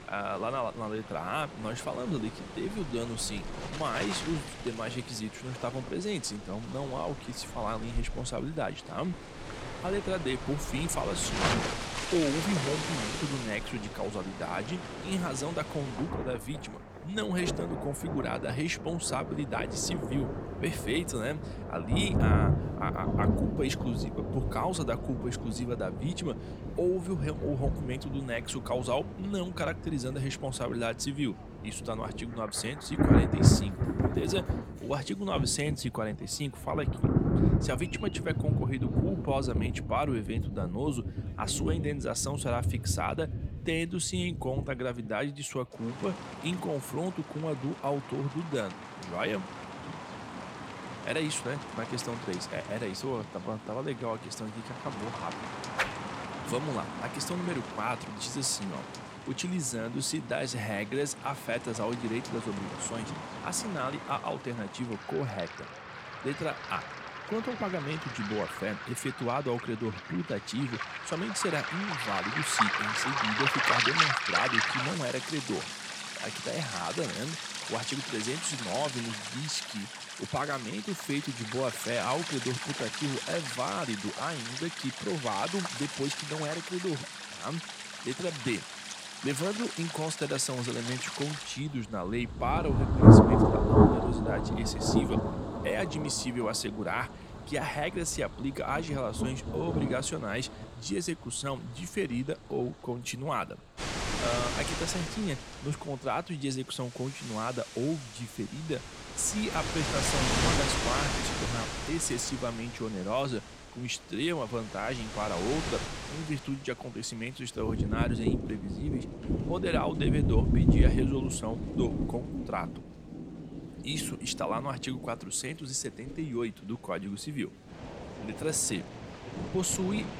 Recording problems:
rain or running water; very loud; throughout; 2 dB above the speech
murmuring crowd; faint; throughout; 25 dB below the speech

